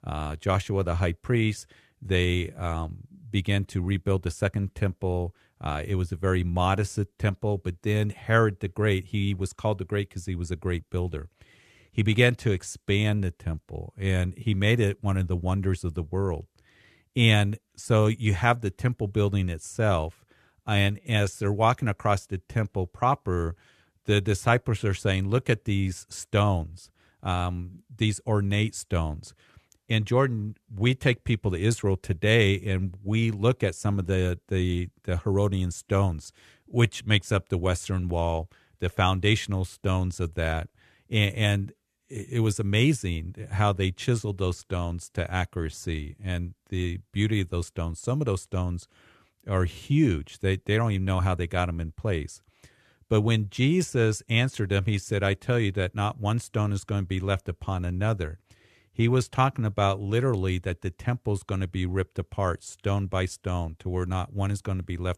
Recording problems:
none

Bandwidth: 13.5 kHz